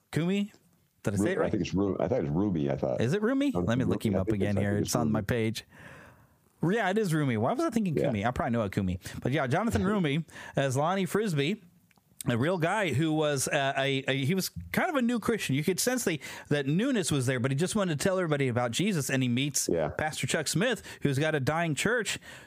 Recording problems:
squashed, flat; somewhat

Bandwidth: 15 kHz